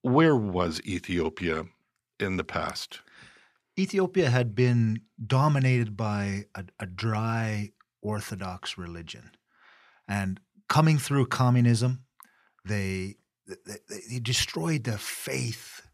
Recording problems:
none

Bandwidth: 14.5 kHz